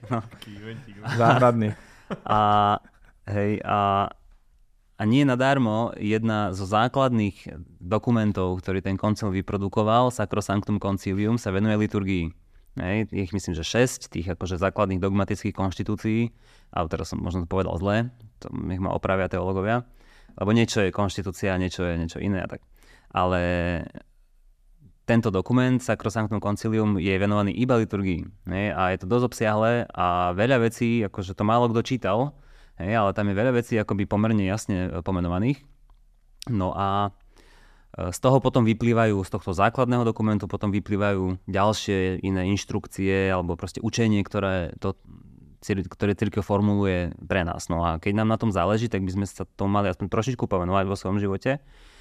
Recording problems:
none

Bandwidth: 14.5 kHz